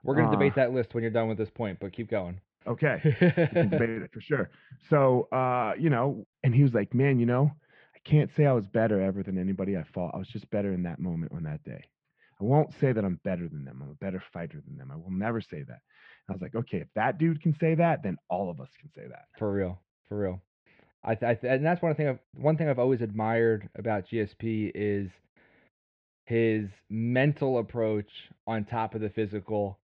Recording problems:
muffled; very; fading above 3 kHz

